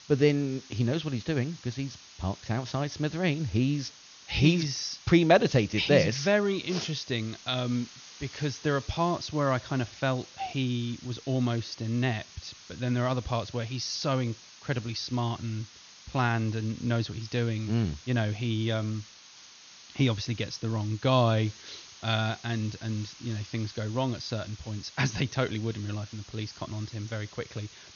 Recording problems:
high frequencies cut off; noticeable; nothing above 6.5 kHz
hiss; noticeable; throughout; 20 dB below the speech

